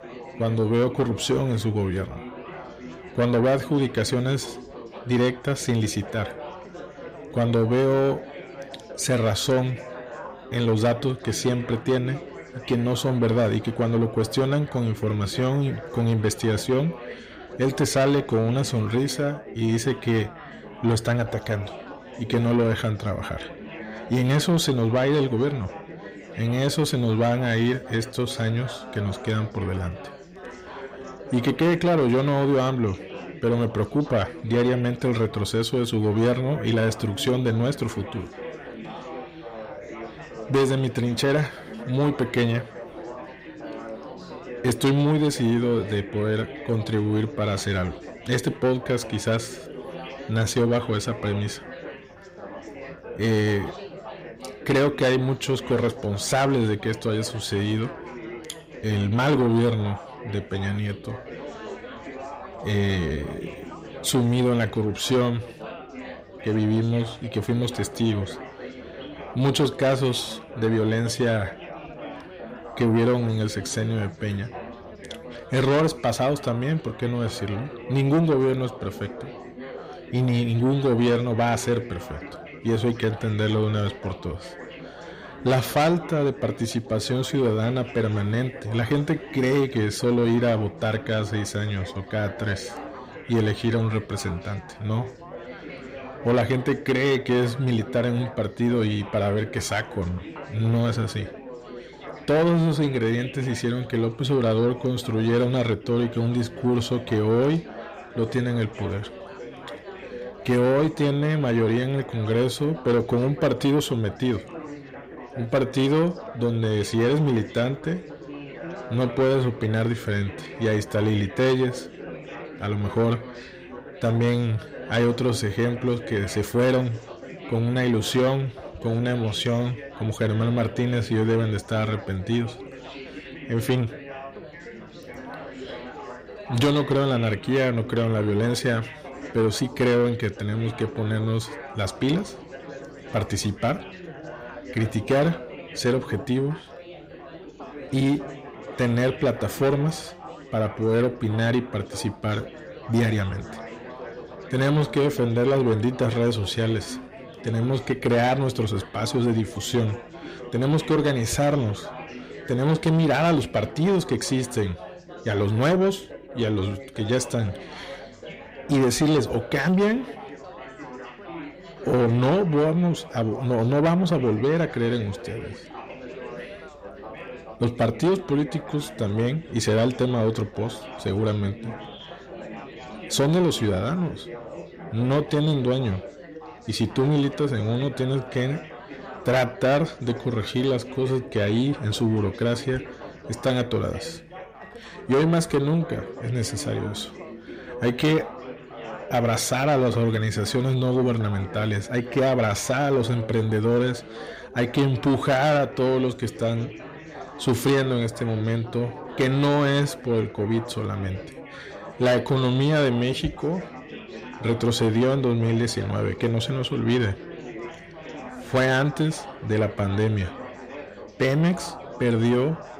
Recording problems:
distortion; slight; 10 dB below the speech
chatter from many people; noticeable; throughout; 15 dB below the speech

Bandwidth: 15.5 kHz